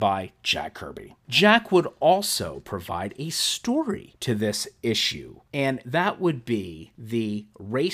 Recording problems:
abrupt cut into speech; at the start and the end

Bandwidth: 15 kHz